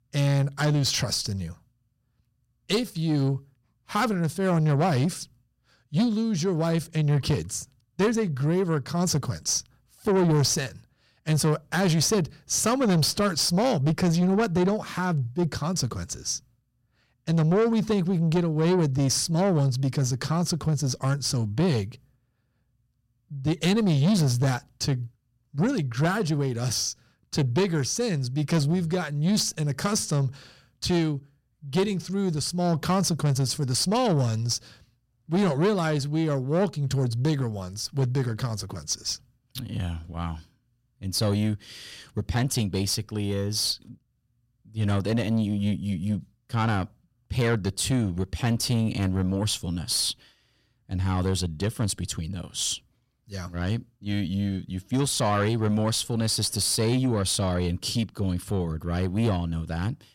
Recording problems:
distortion; slight; 10 dB below the speech

